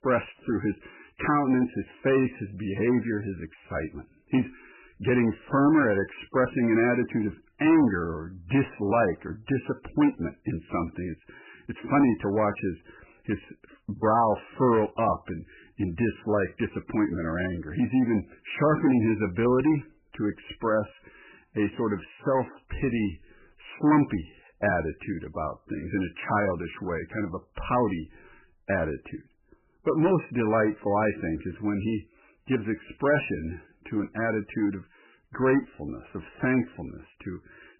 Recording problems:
garbled, watery; badly; nothing above 3 kHz
distortion; slight; 10 dB below the speech

